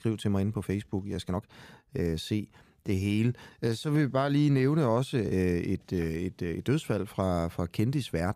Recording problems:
uneven, jittery; strongly; from 0.5 to 6.5 s

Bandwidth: 15 kHz